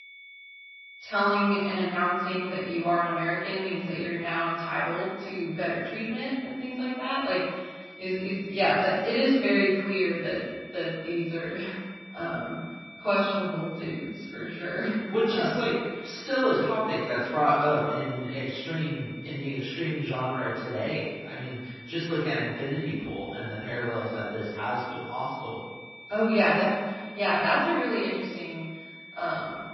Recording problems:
room echo; strong; dies away in 1.3 s
off-mic speech; far
garbled, watery; slightly; nothing above 5.5 kHz
high-pitched whine; noticeable; throughout; 2.5 kHz, 15 dB below the speech

